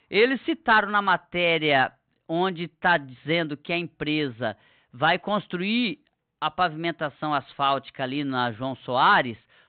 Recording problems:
high frequencies cut off; severe; nothing above 4 kHz

